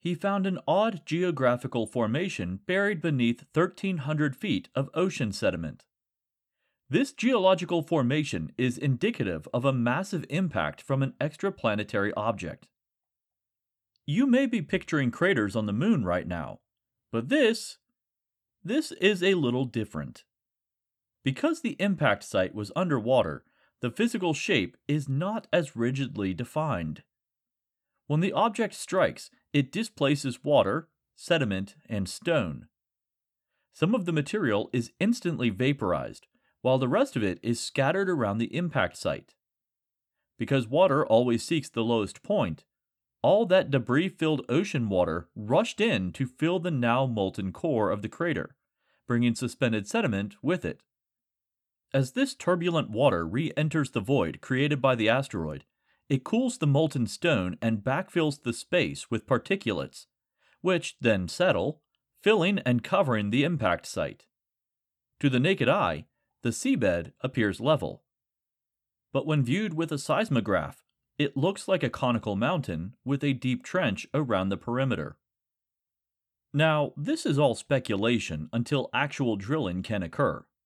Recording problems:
none

